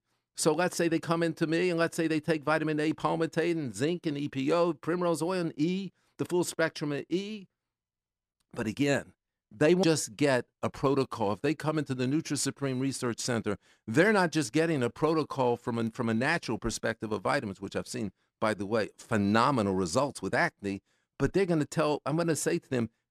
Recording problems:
none

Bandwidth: 14 kHz